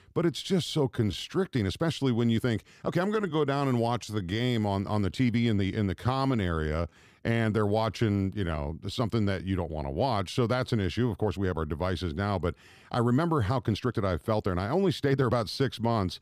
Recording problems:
uneven, jittery; strongly; from 1 to 15 s

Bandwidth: 15 kHz